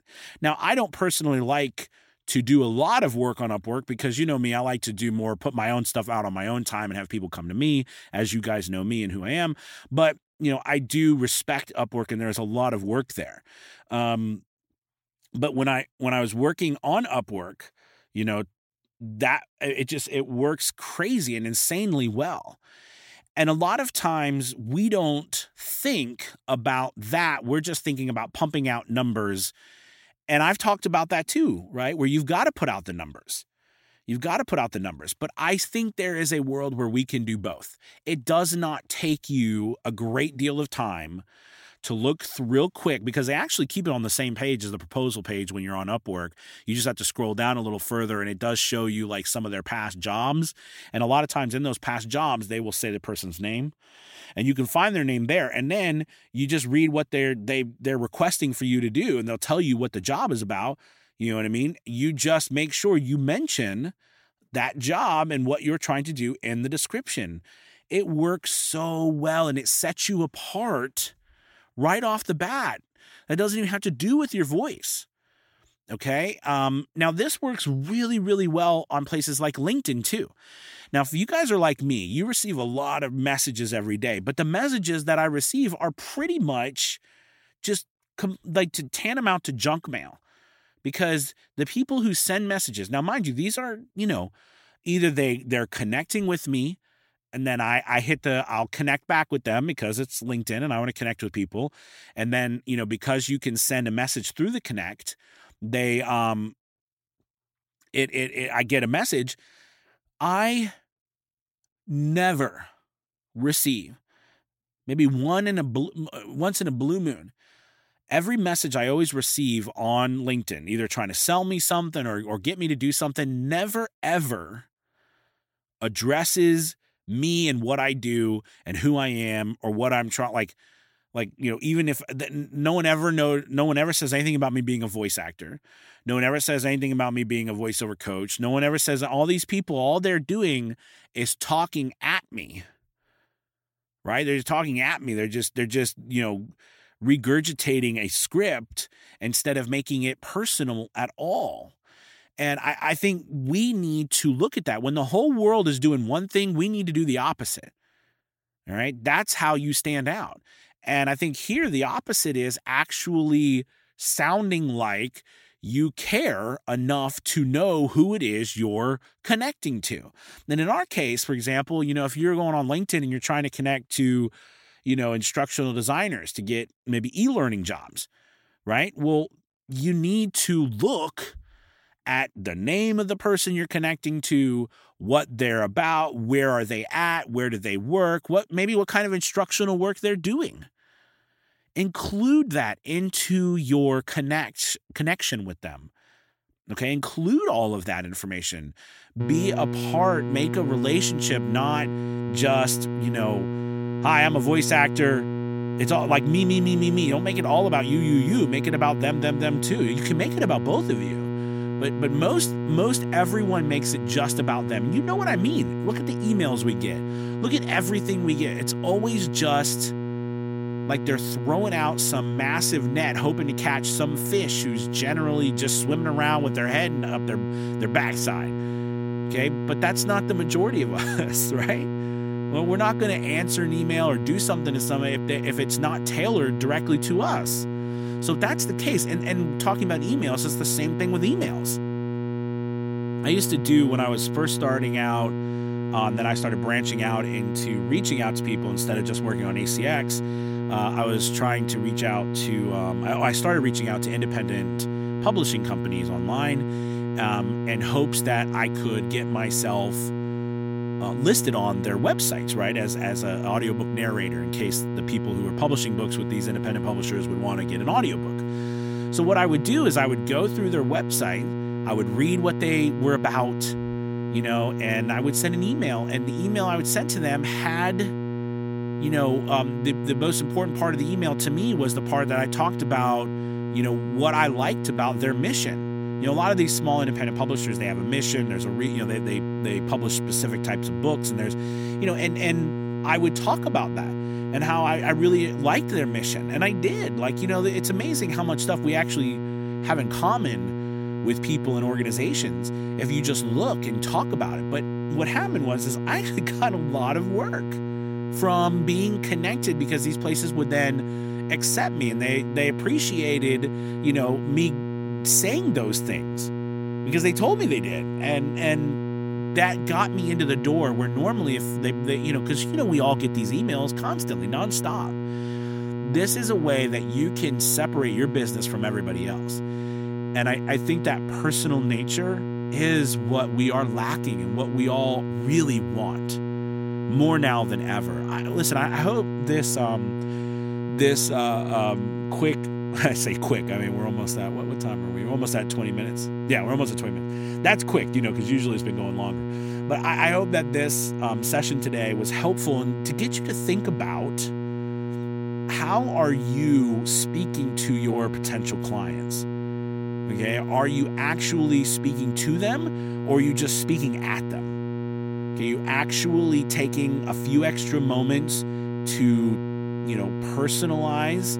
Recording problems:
electrical hum; loud; from 3:19 on; 60 Hz, 8 dB below the speech

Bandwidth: 16.5 kHz